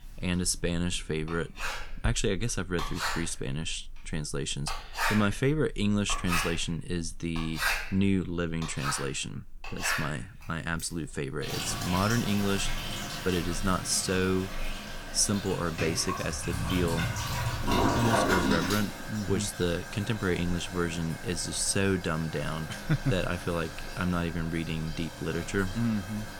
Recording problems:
household noises; loud; throughout; 3 dB below the speech

